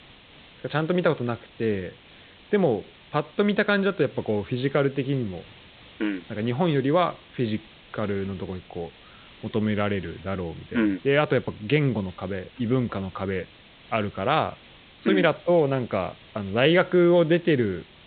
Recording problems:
high frequencies cut off; severe; nothing above 4 kHz
hiss; faint; throughout; 25 dB below the speech

